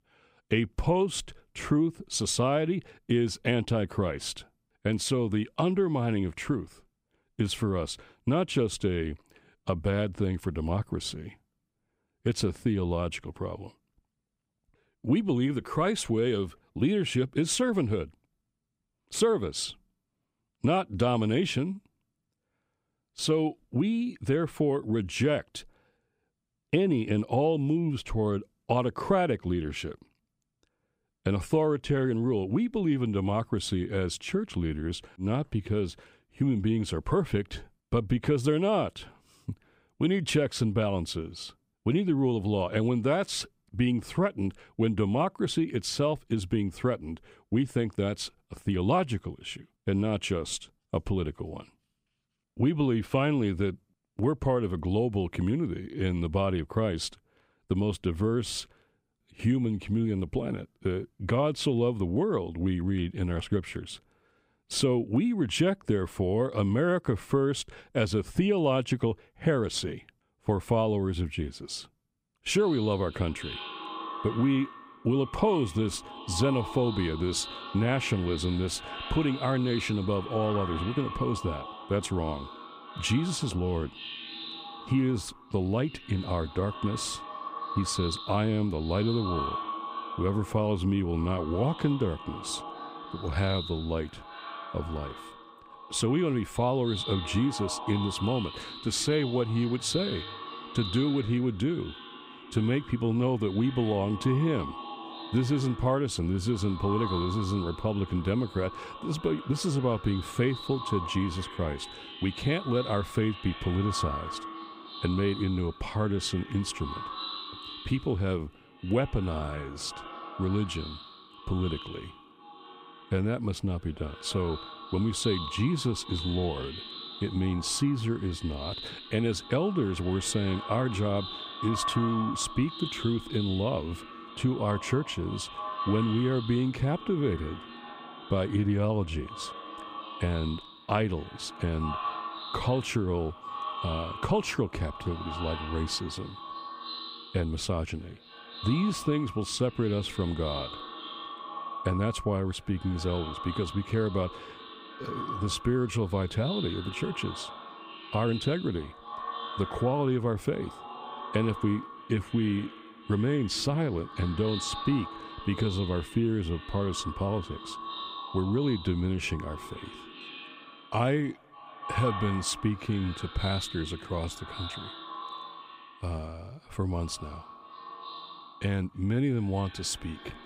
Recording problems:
echo of what is said; strong; from 1:12 on; 290 ms later, 10 dB below the speech

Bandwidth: 15.5 kHz